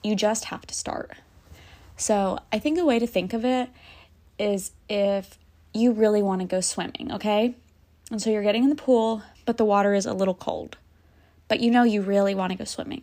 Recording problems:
none

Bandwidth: 15 kHz